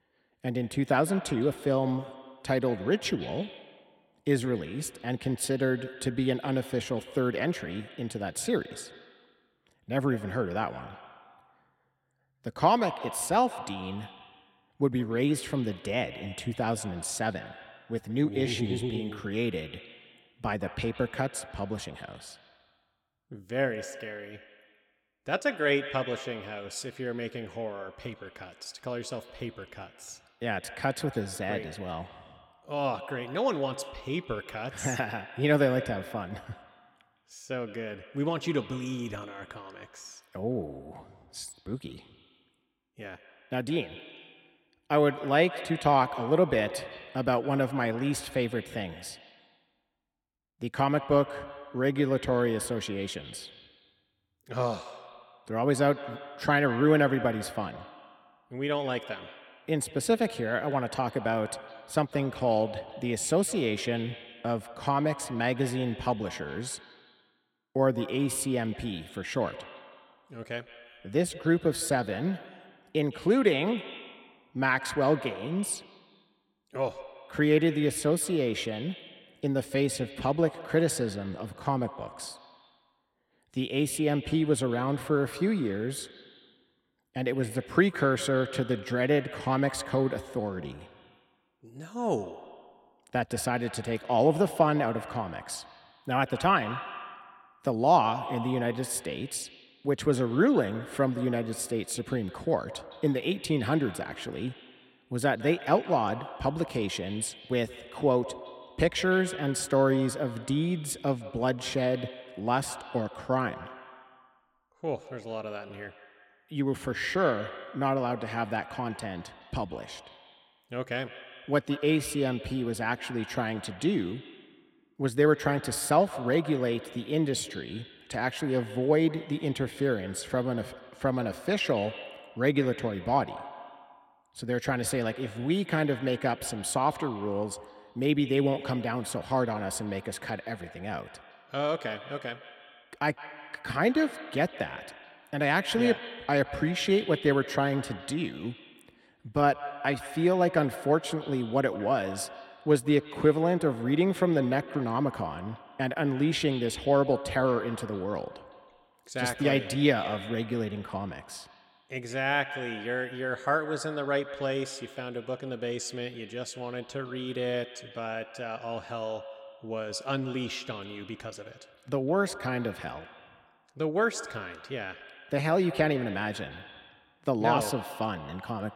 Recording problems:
echo of what is said; noticeable; throughout; 160 ms later, 15 dB below the speech

